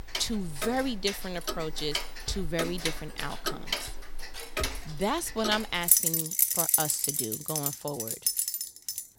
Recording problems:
household noises; very loud; throughout; 4 dB above the speech

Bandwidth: 16 kHz